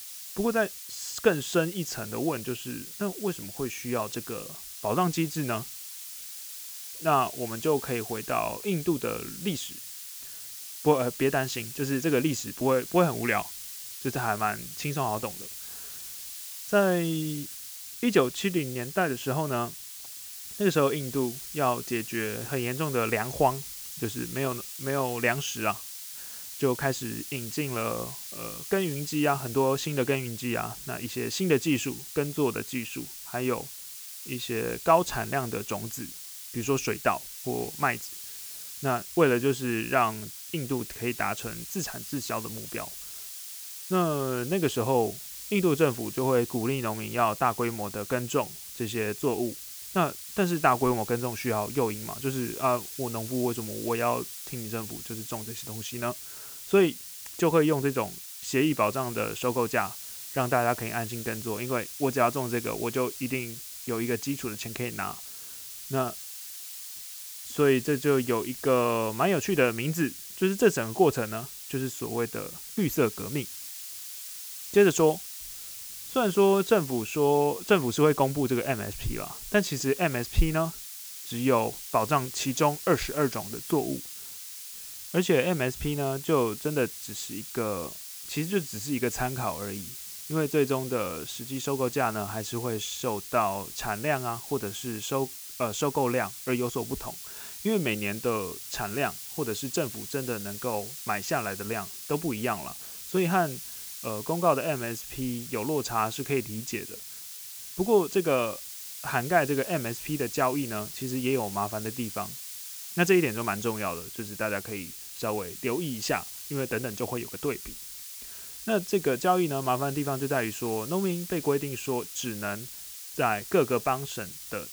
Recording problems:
hiss; loud; throughout; 9 dB below the speech

